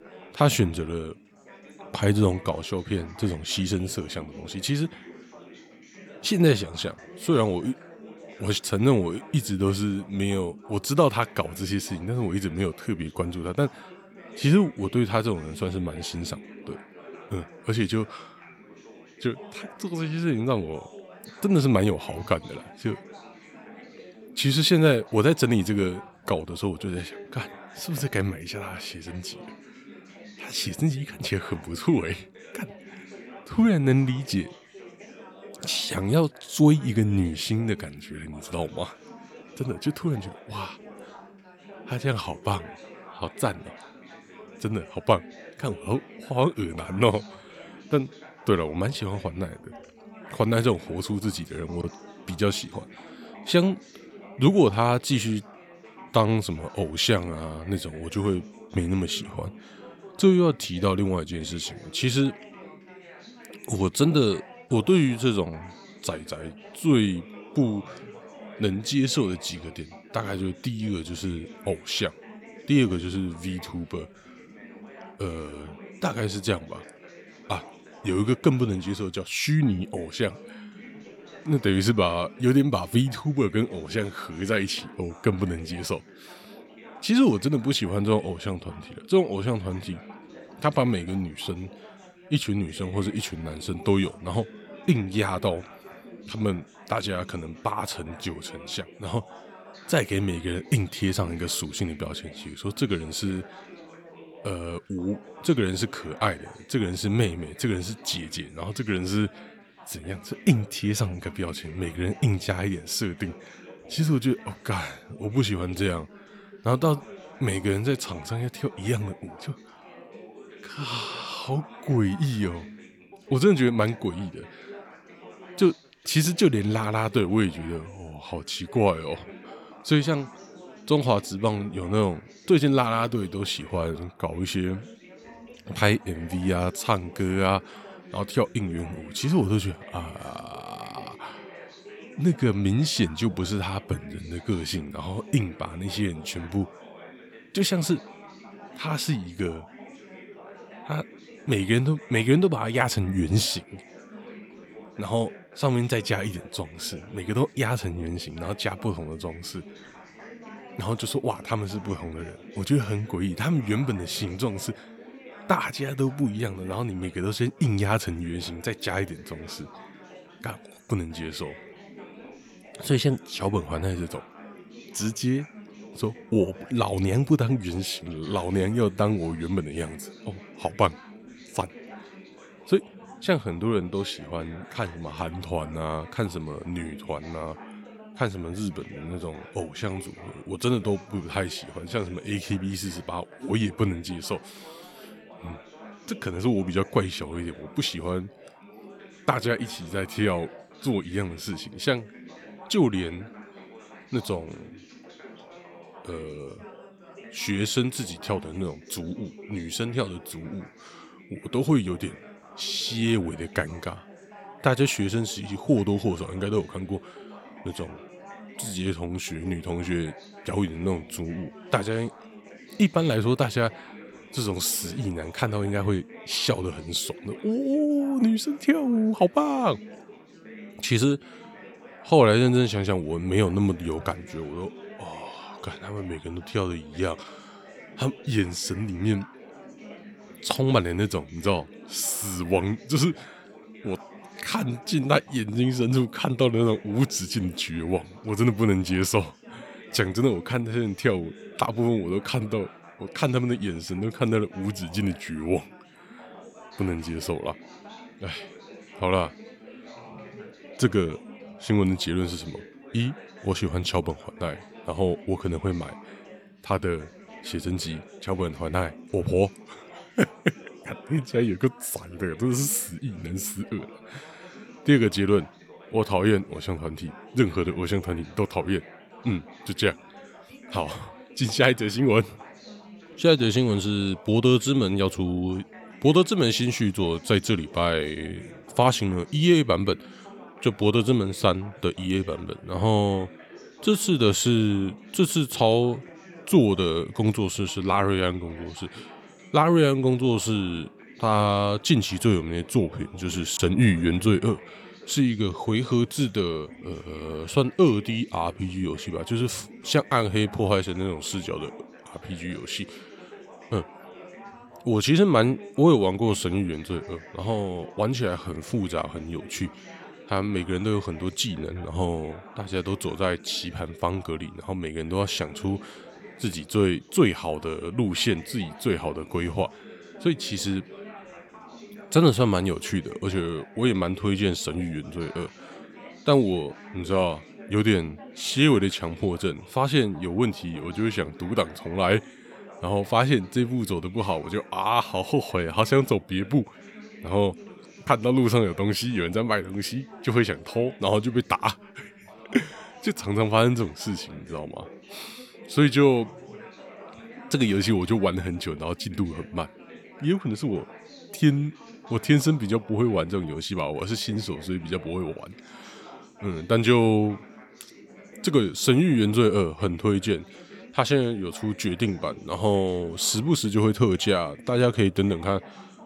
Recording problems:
background chatter; noticeable; throughout; 4 voices, 20 dB below the speech

